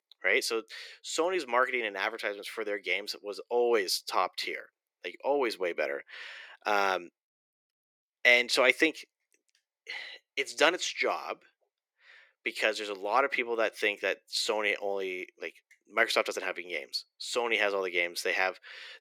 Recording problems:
thin; very; fading below 400 Hz

